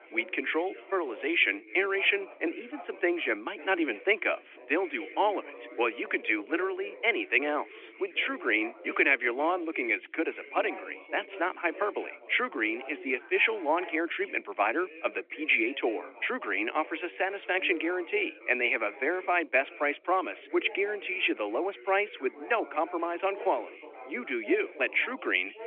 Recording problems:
thin; very; fading below 300 Hz
phone-call audio
background chatter; noticeable; throughout; 4 voices, 15 dB below the speech

